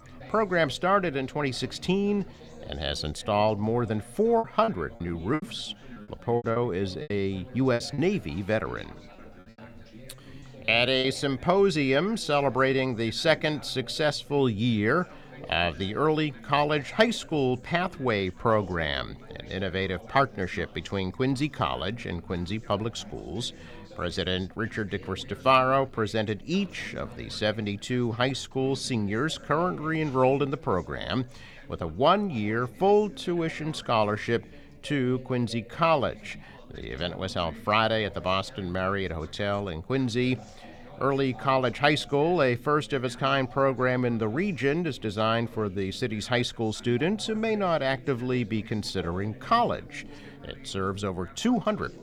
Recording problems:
background chatter; faint; throughout; 4 voices, 20 dB below the speech
choppy; very; from 4.5 to 8 s and at 10 s; 14% of the speech affected

